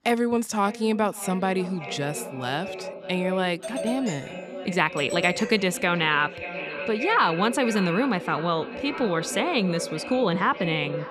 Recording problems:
echo of what is said; strong; throughout; 580 ms later, 10 dB below the speech
doorbell; noticeable; from 3.5 to 6 s; peak 8 dB below the speech
uneven, jittery; strongly; from 3.5 to 10 s

